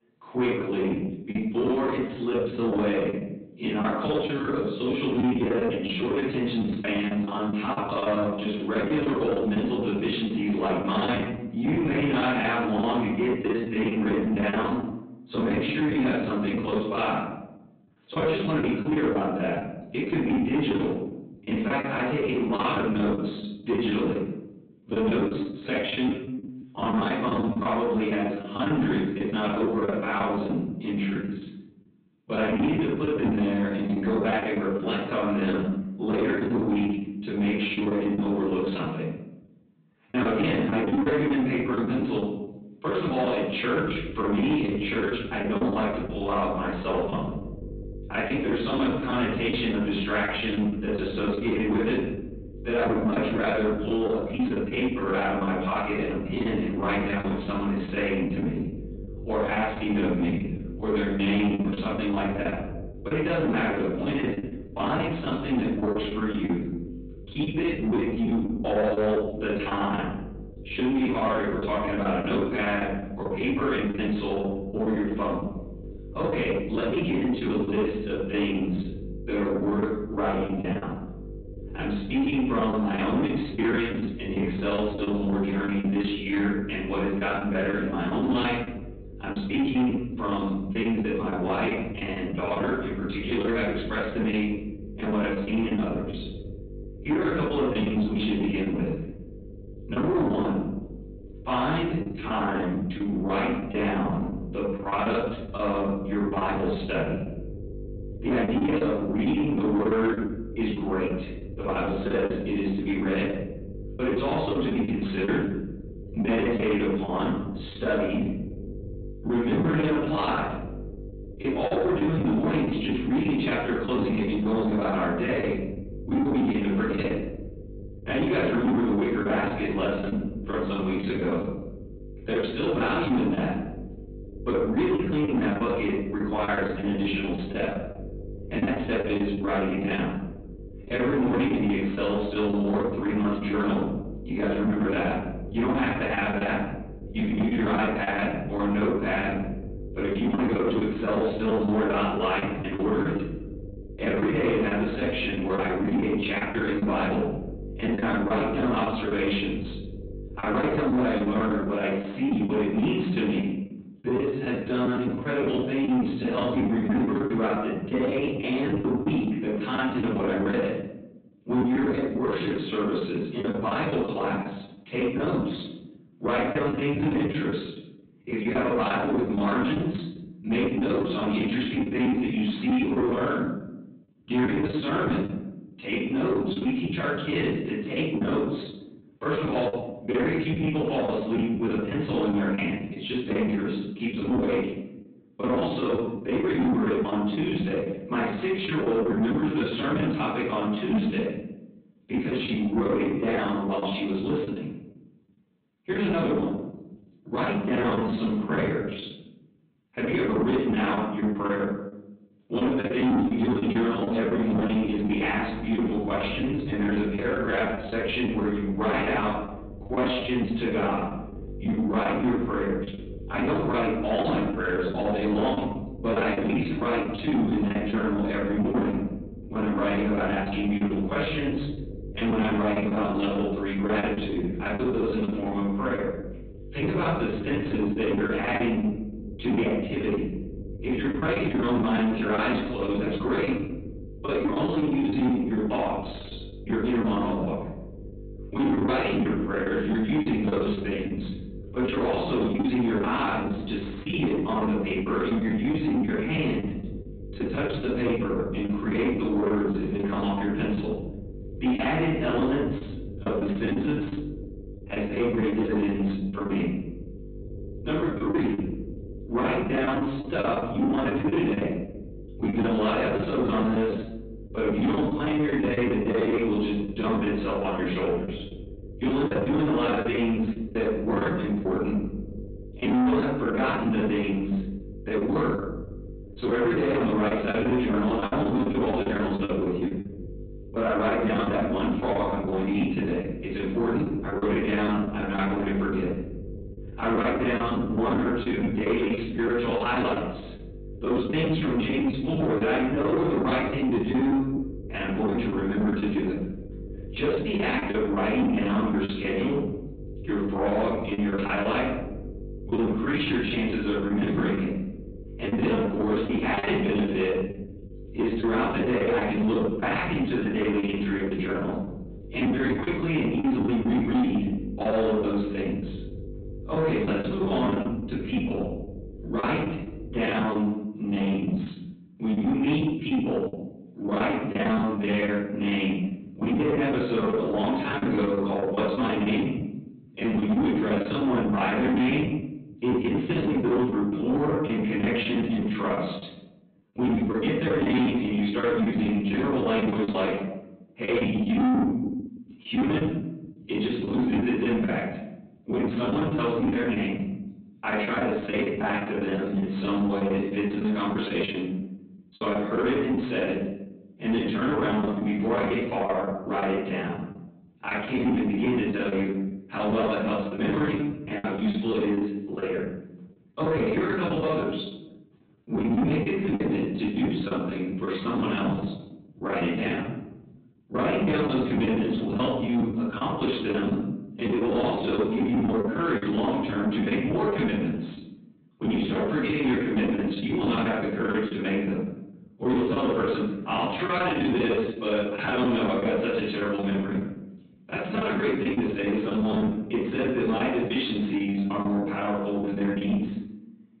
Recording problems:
off-mic speech; far
high frequencies cut off; severe; nothing above 4 kHz
room echo; noticeable; dies away in 0.8 s
distortion; slight; 10 dB below the speech
electrical hum; noticeable; from 44 s to 2:42 and from 3:35 to 5:30; 50 Hz, 20 dB below the speech
choppy; very; 15% of the speech affected

